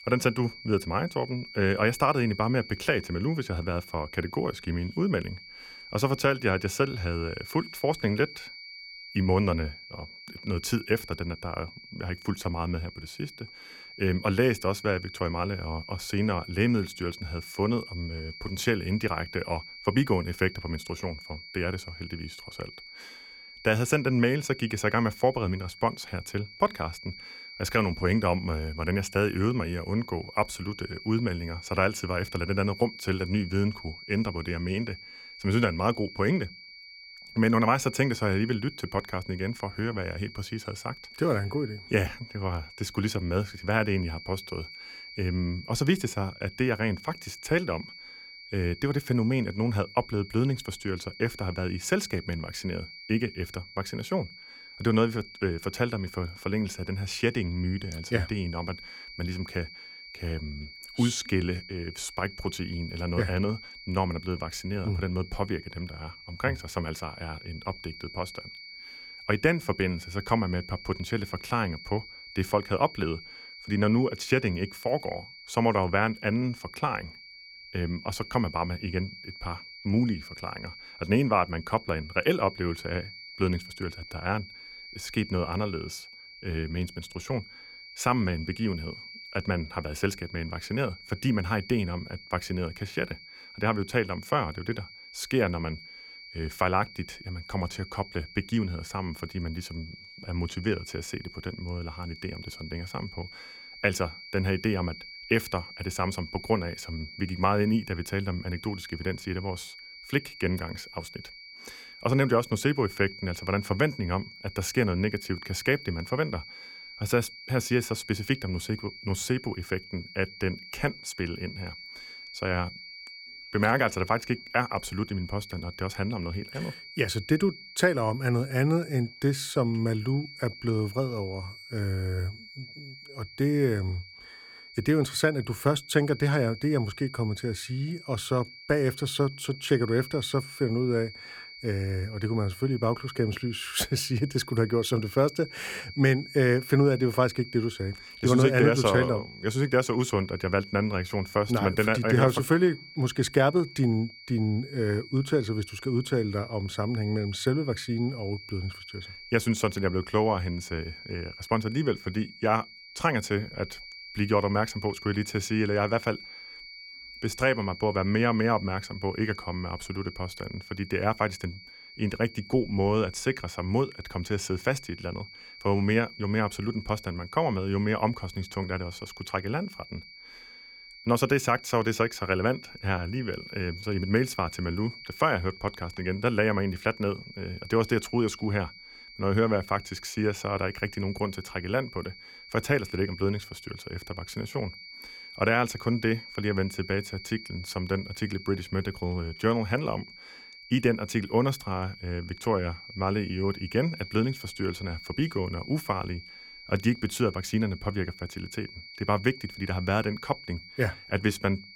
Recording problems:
high-pitched whine; noticeable; throughout; 2.5 kHz, 15 dB below the speech

